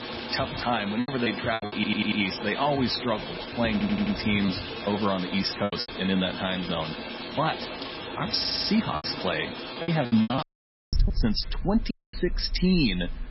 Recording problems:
garbled, watery; badly; nothing above 5.5 kHz
rain or running water; loud; throughout; 7 dB below the speech
choppy; very; at 1 s, from 4.5 to 6 s and from 9 to 10 s; 17% of the speech affected
audio stuttering; at 1.5 s, at 3.5 s and at 8.5 s
audio cutting out; at 10 s for 0.5 s and at 12 s

